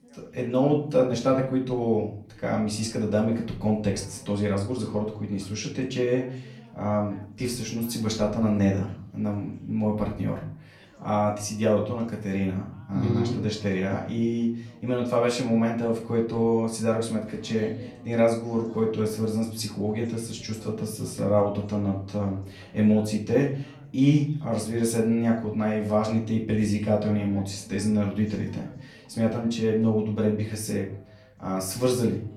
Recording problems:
off-mic speech; far
room echo; slight; dies away in 0.4 s
background chatter; faint; throughout; 2 voices, 25 dB below the speech

